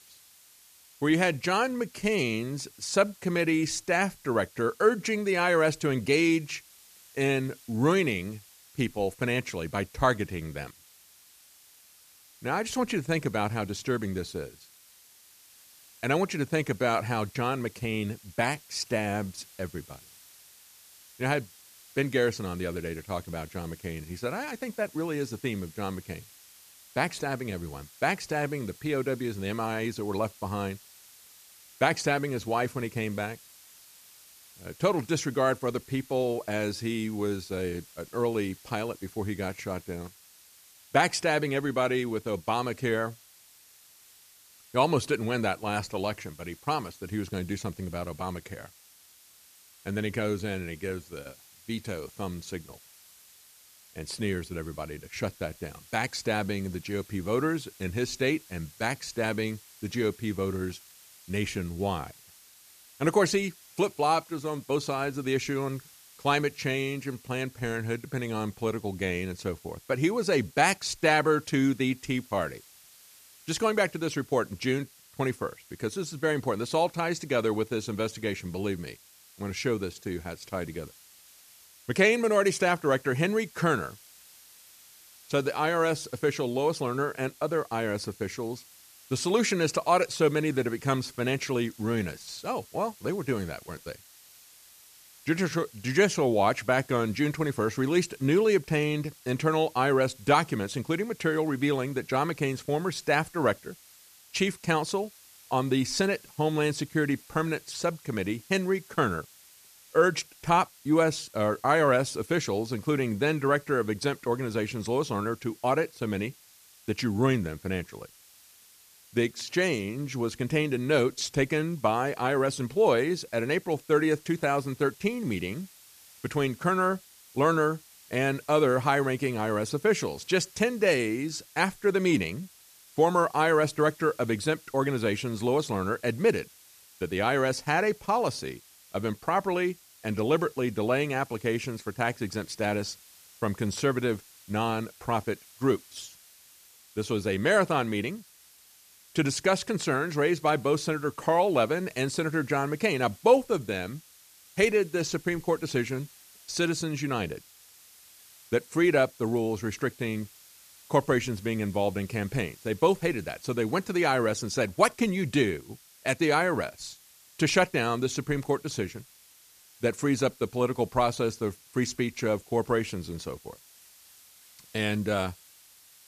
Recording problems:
hiss; faint; throughout; 25 dB below the speech

